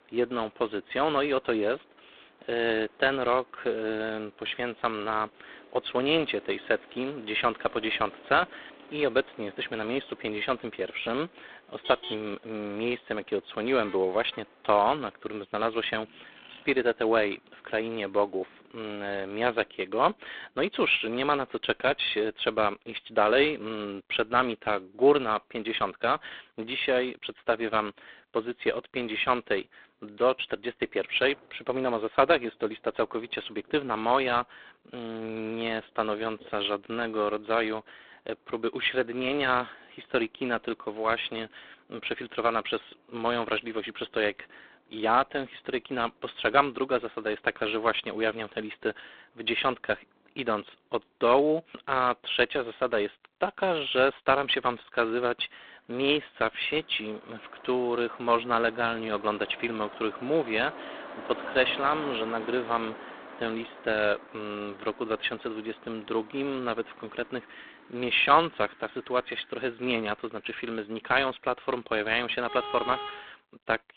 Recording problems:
phone-call audio; poor line; nothing above 3.5 kHz
traffic noise; noticeable; throughout; 15 dB below the speech

